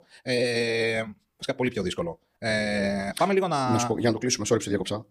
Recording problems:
wrong speed, natural pitch; too fast; 1.5 times normal speed

